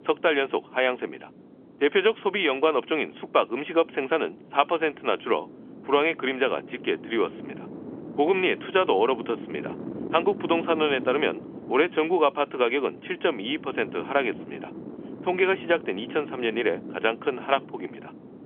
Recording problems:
phone-call audio; nothing above 3.5 kHz
wind noise on the microphone; occasional gusts; 20 dB below the speech

